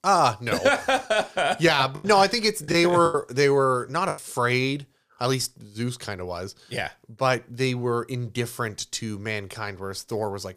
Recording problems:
choppy; very; from 2 to 4 s; 12% of the speech affected

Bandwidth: 15 kHz